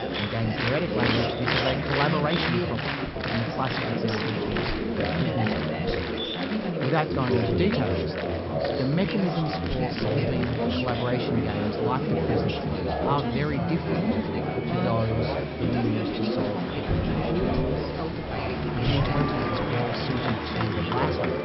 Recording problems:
high frequencies cut off; noticeable; nothing above 5.5 kHz
chatter from many people; very loud; throughout; 3 dB above the speech

